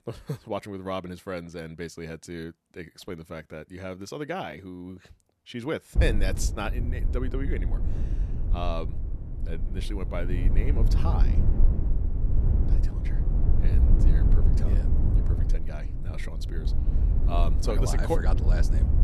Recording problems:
low rumble; loud; from 6 s on; 7 dB below the speech

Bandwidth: 13.5 kHz